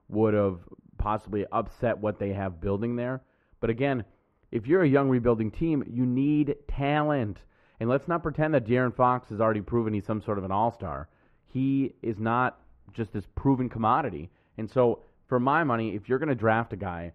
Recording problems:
muffled; very; fading above 3 kHz

